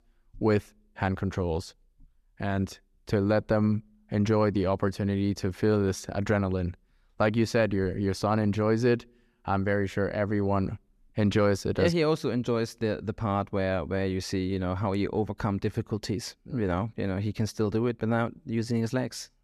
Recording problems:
none

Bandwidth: 13.5 kHz